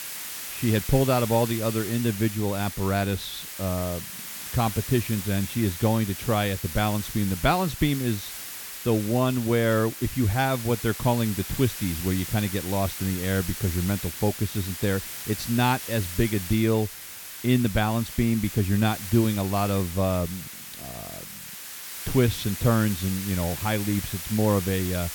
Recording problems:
hiss; loud; throughout; 8 dB below the speech

